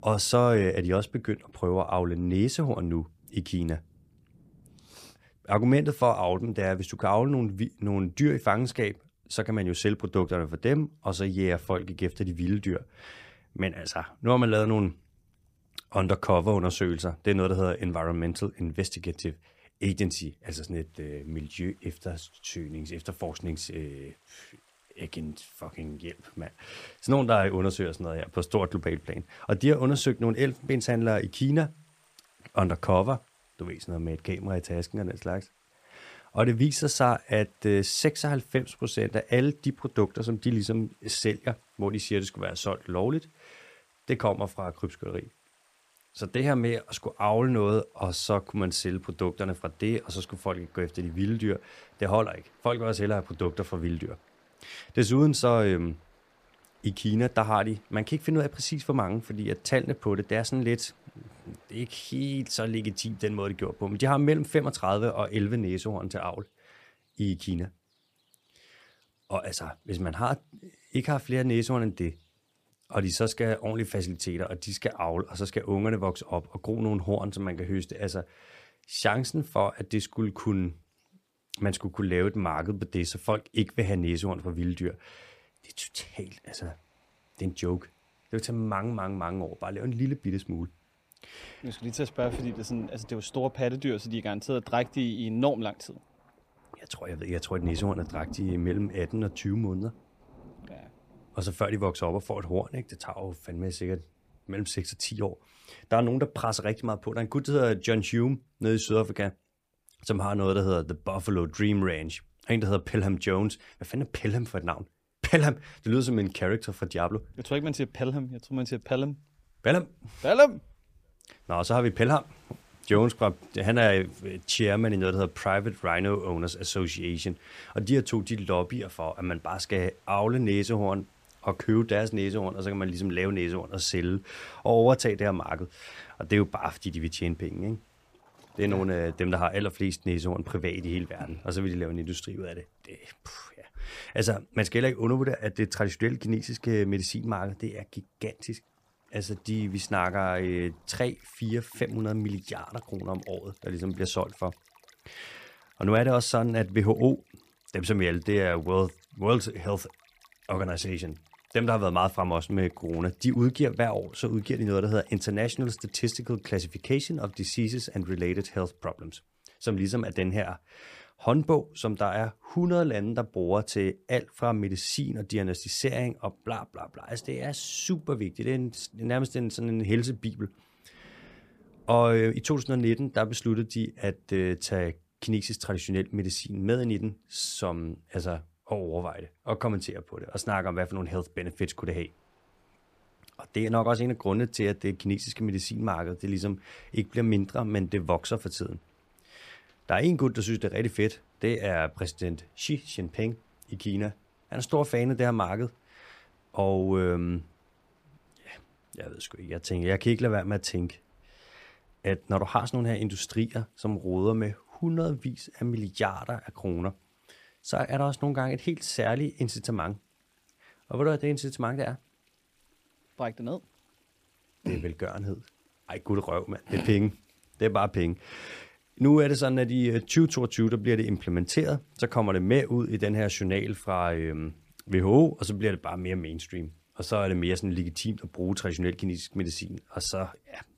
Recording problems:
rain or running water; faint; throughout; 30 dB below the speech

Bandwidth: 15 kHz